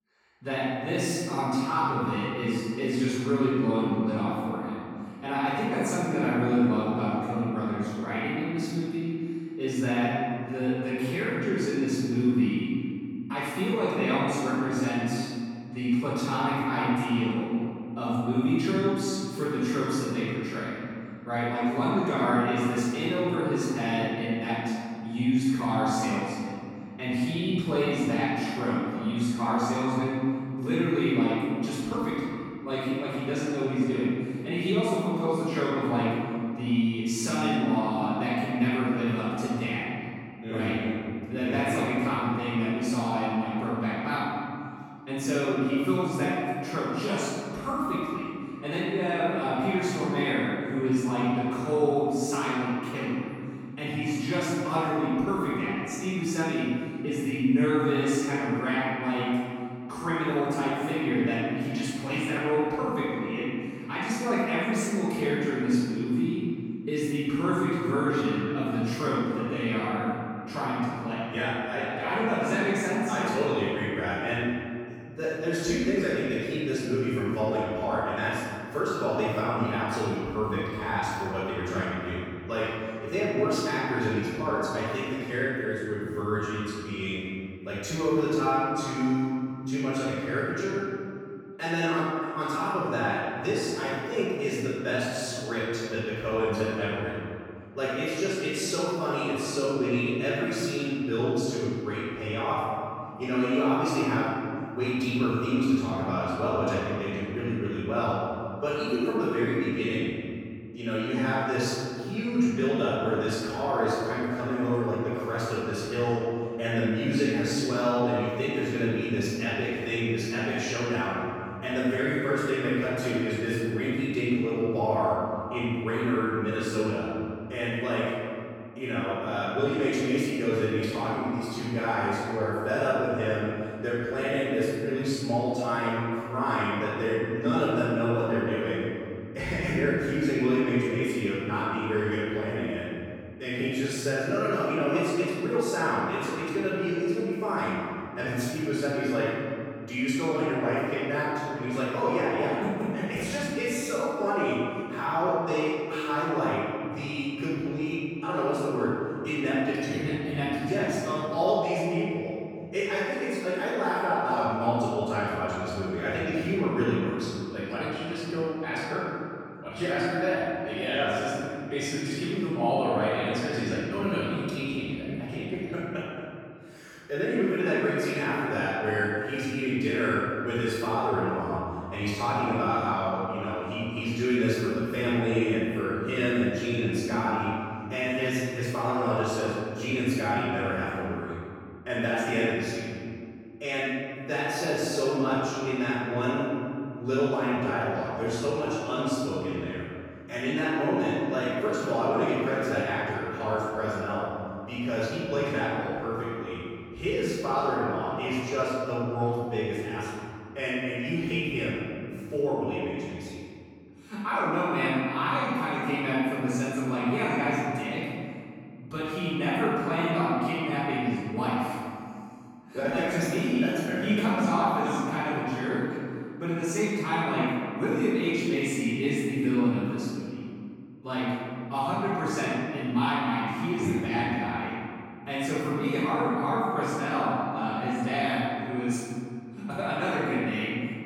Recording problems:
room echo; strong; dies away in 2.4 s
off-mic speech; far

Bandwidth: 17 kHz